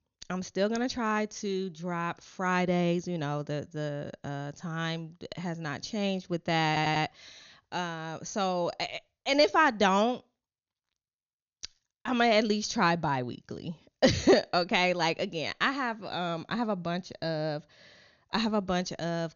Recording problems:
high frequencies cut off; noticeable; nothing above 6.5 kHz
audio stuttering; at 6.5 s

